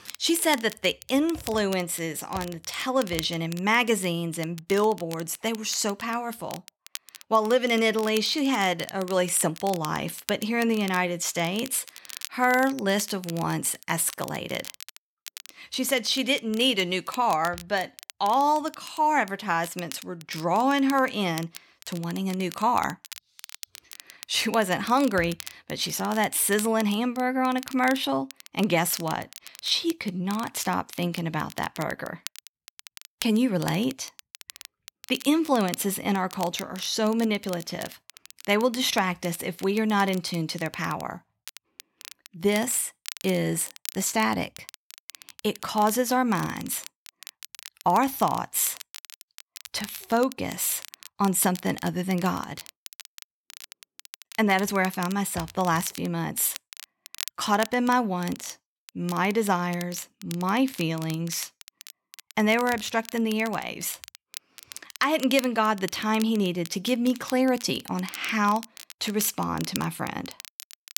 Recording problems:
crackle, like an old record; noticeable; 15 dB below the speech

